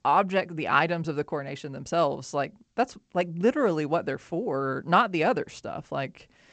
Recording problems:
garbled, watery; slightly; nothing above 8 kHz

